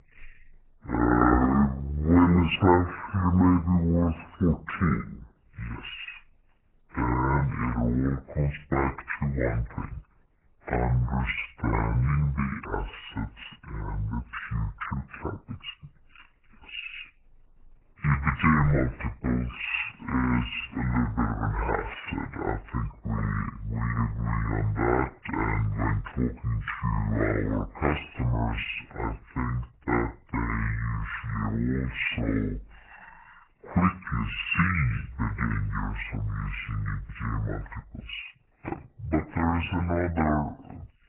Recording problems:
garbled, watery; badly; nothing above 3 kHz
wrong speed and pitch; too slow and too low; 0.6 times normal speed

